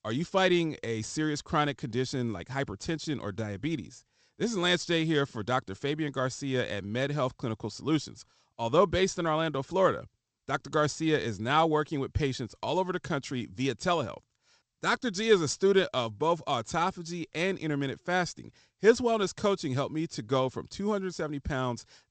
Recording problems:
garbled, watery; slightly; nothing above 8 kHz

